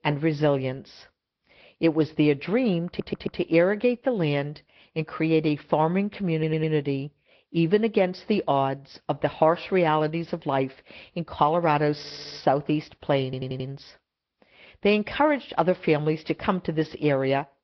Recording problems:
high frequencies cut off; noticeable; nothing above 5.5 kHz
garbled, watery; slightly
audio stuttering; 4 times, first at 3 s

